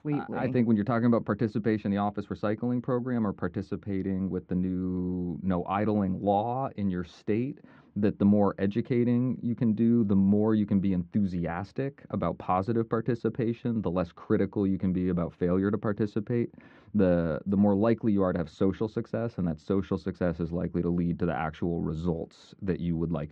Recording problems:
muffled; very; fading above 1.5 kHz

